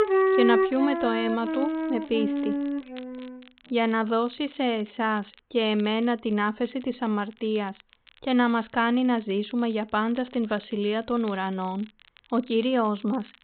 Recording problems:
high frequencies cut off; severe; nothing above 4 kHz
background music; very loud; until 3 s; as loud as the speech
crackle, like an old record; faint; 25 dB below the speech

